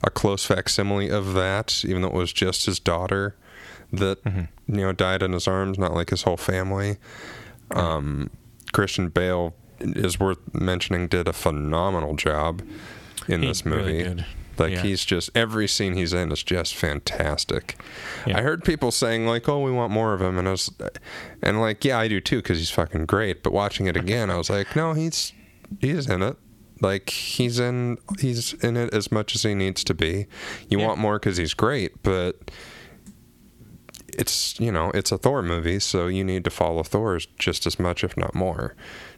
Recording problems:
squashed, flat; heavily

